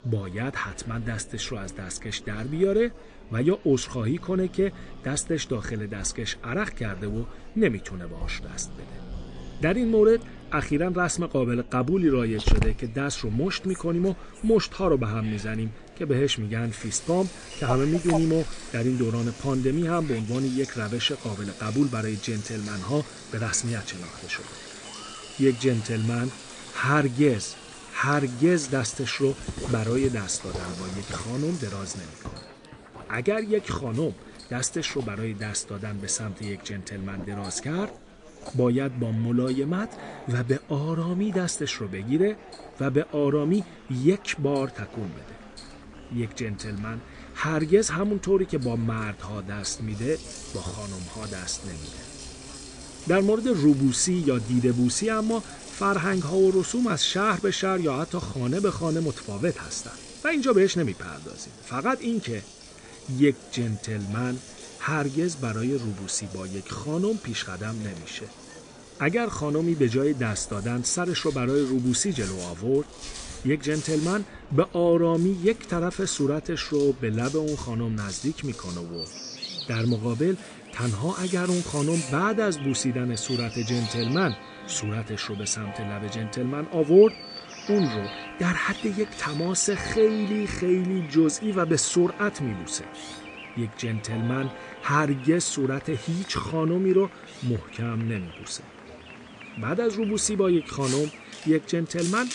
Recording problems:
garbled, watery; slightly; nothing above 9 kHz
animal sounds; noticeable; throughout; 15 dB below the speech
household noises; noticeable; throughout; 15 dB below the speech
murmuring crowd; faint; throughout; 20 dB below the speech

